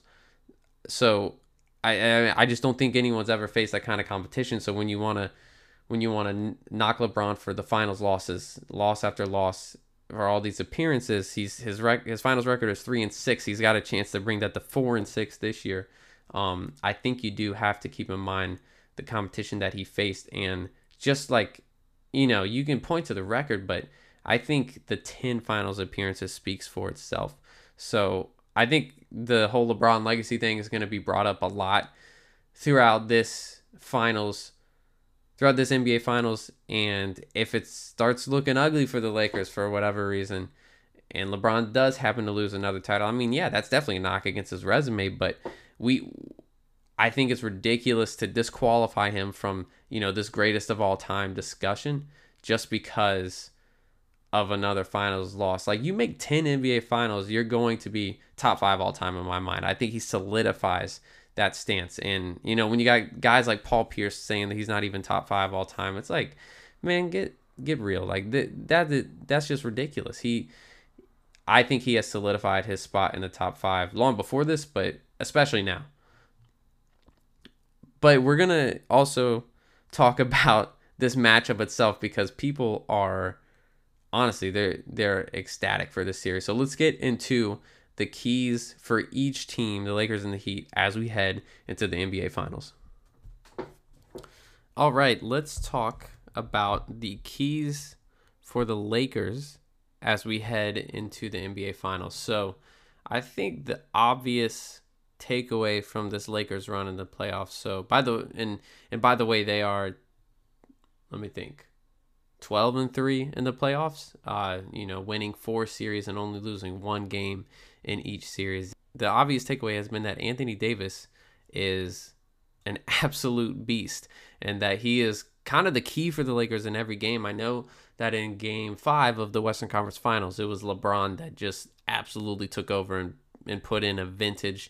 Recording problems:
none

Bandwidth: 15 kHz